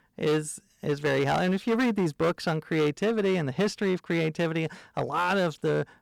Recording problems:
distortion; slight; 10% of the sound clipped

